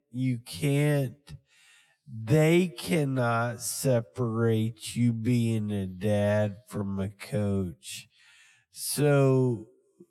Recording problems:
wrong speed, natural pitch; too slow; 0.5 times normal speed

